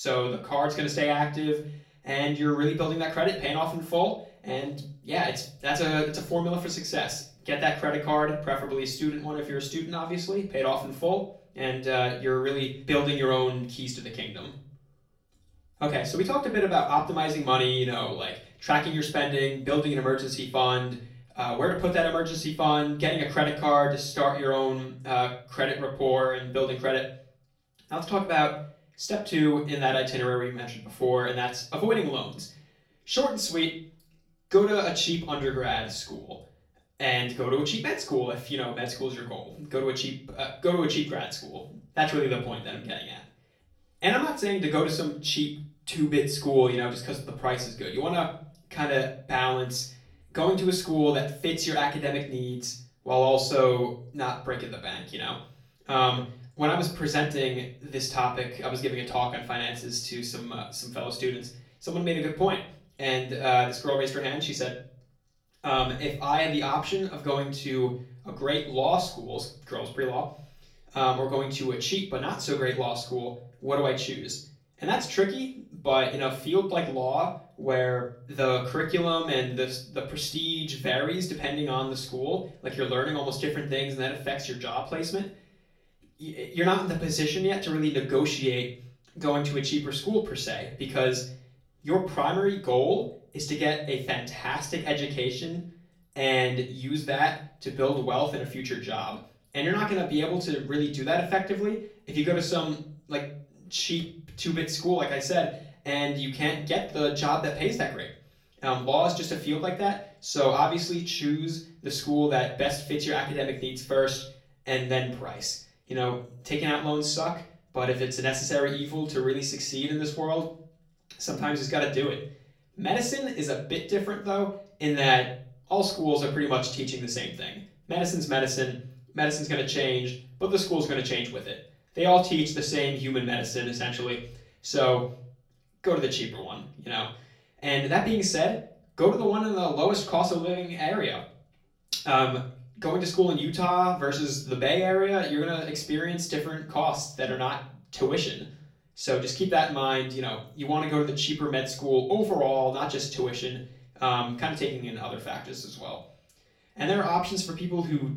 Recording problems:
off-mic speech; far
room echo; slight; dies away in 0.4 s
abrupt cut into speech; at the start

